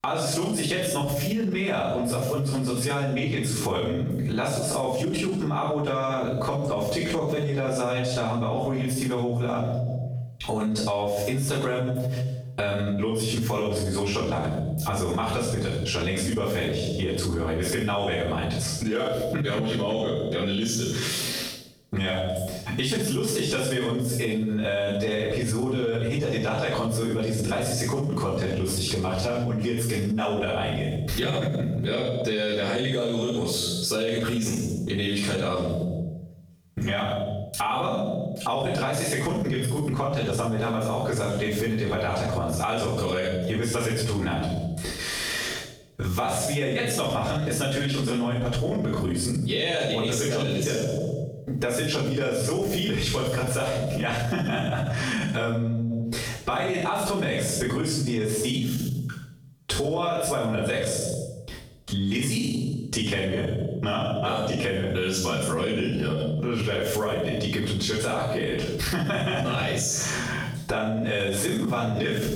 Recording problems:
room echo; strong; dies away in 0.7 s
off-mic speech; far
squashed, flat; heavily

